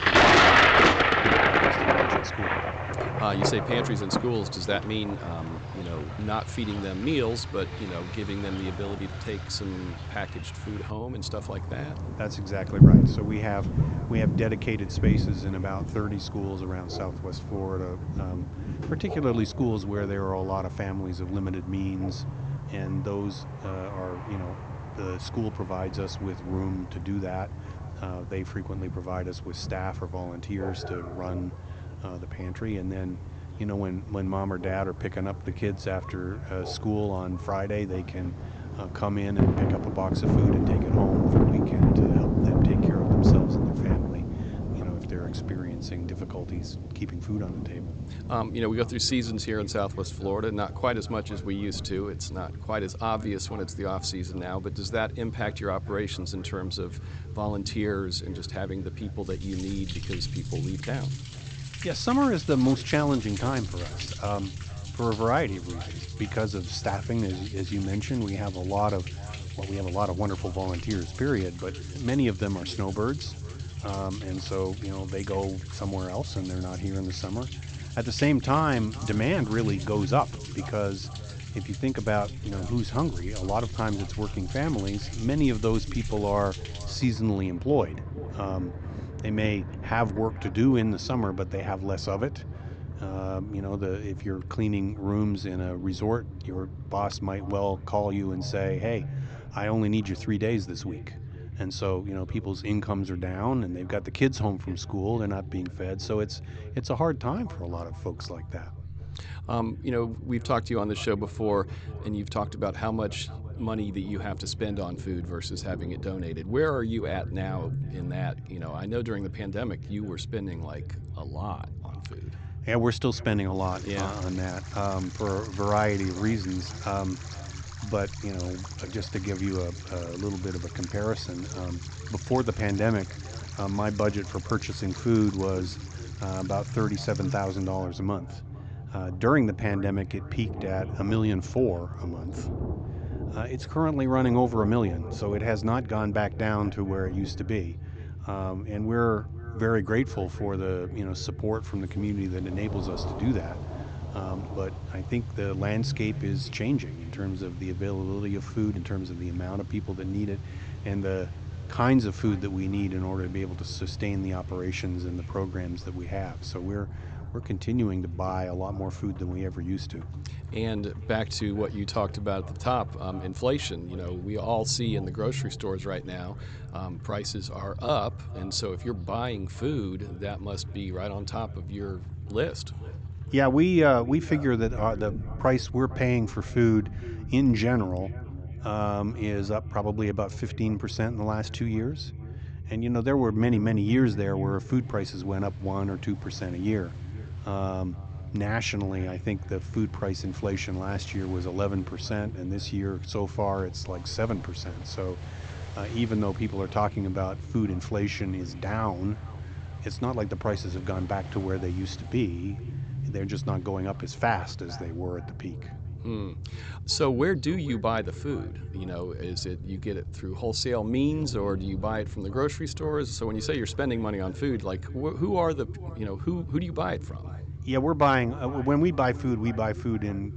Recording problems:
high frequencies cut off; noticeable; nothing above 8 kHz
echo of what is said; faint; throughout; 450 ms later, 20 dB below the speech
rain or running water; very loud; throughout; 1 dB above the speech
low rumble; noticeable; throughout; 20 dB below the speech

